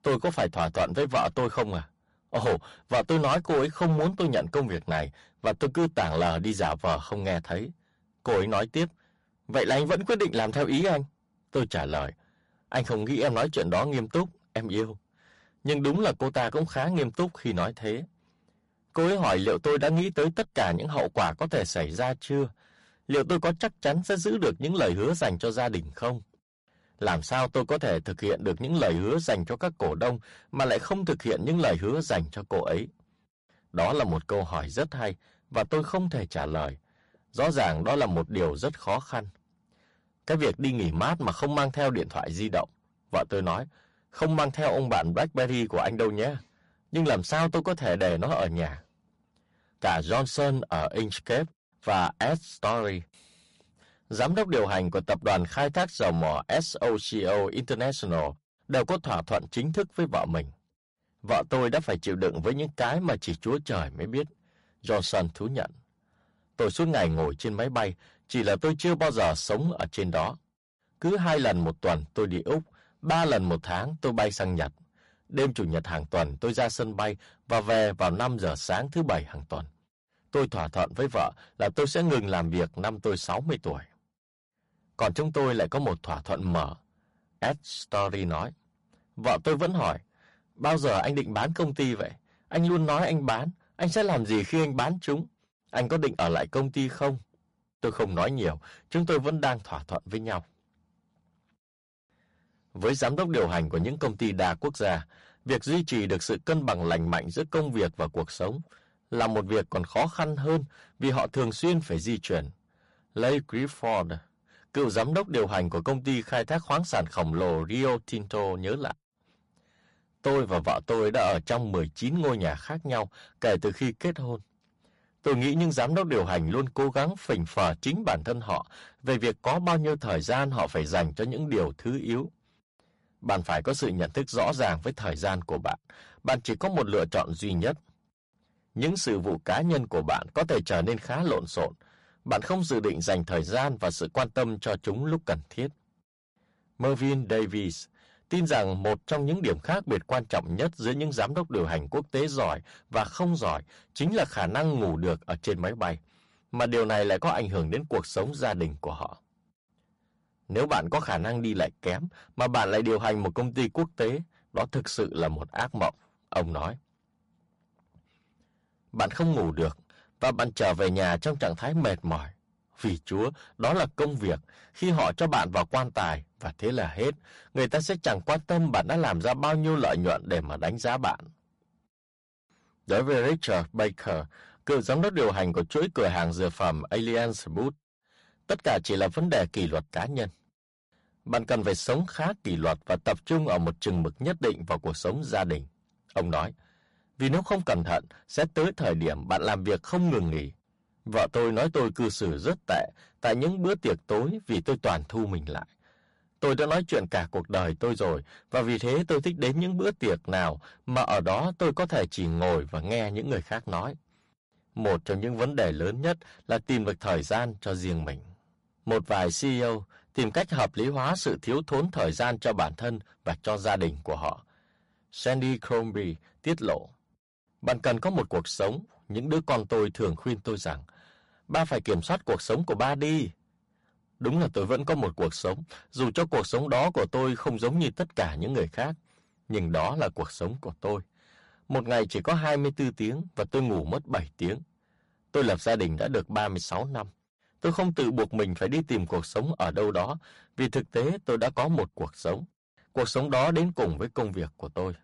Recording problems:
distortion; heavy; 7% of the sound clipped
garbled, watery; slightly; nothing above 11 kHz

